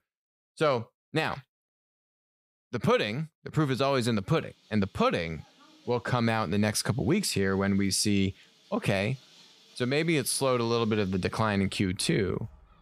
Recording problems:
animal sounds; faint; from 4.5 s on; 30 dB below the speech

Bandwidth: 15.5 kHz